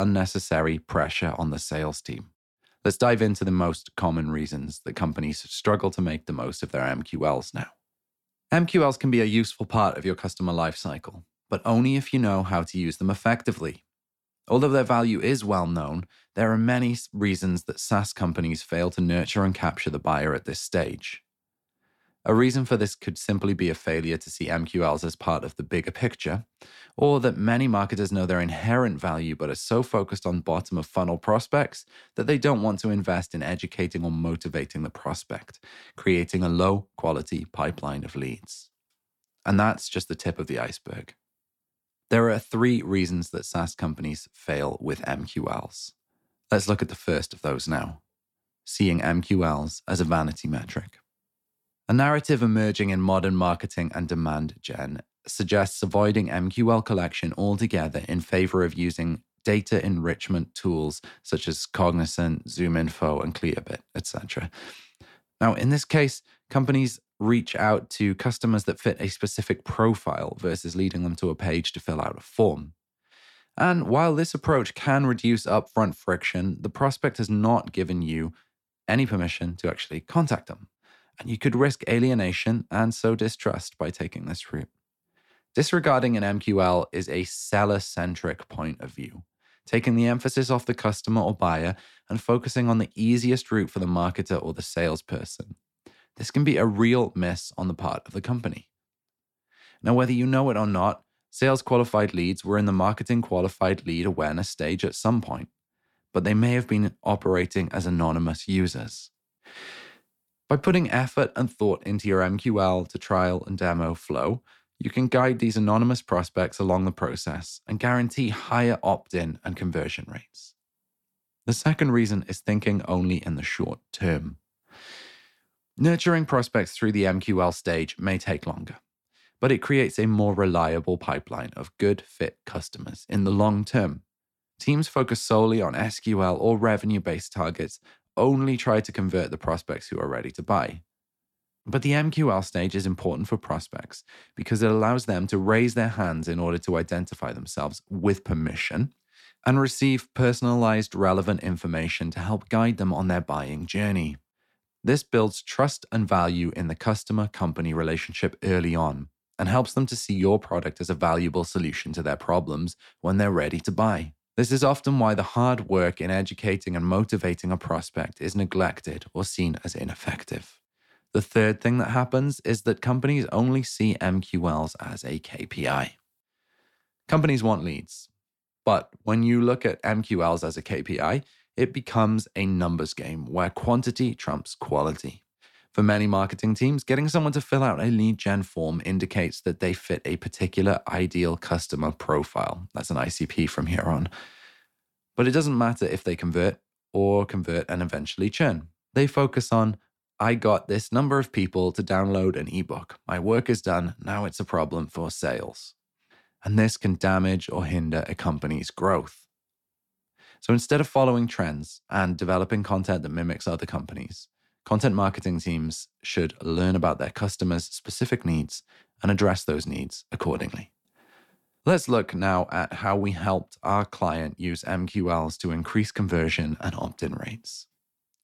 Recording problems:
abrupt cut into speech; at the start

